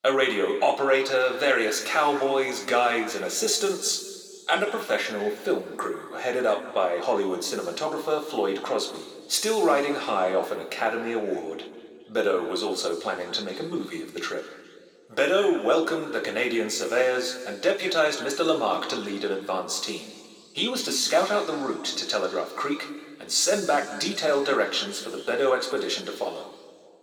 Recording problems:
thin; somewhat; fading below 300 Hz
room echo; slight; dies away in 1.8 s
off-mic speech; somewhat distant

